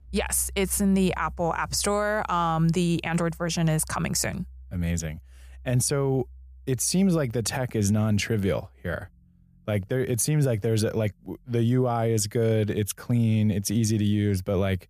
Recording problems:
background music; faint; throughout; 20 dB below the speech

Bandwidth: 14.5 kHz